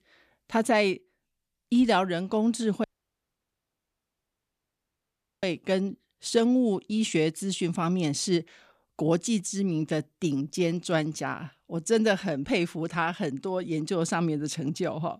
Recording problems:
audio cutting out; at 3 s for 2.5 s

